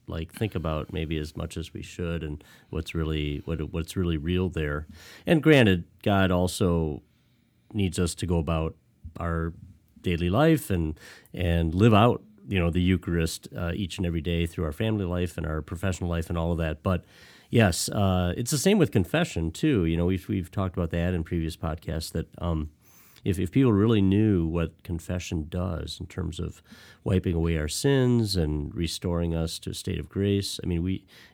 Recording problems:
none

